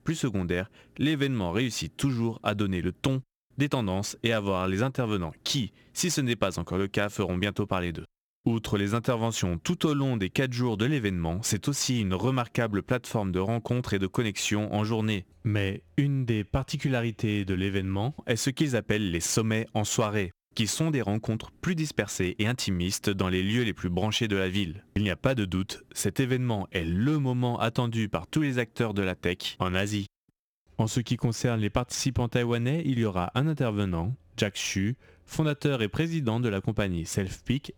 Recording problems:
squashed, flat; somewhat

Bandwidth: 18.5 kHz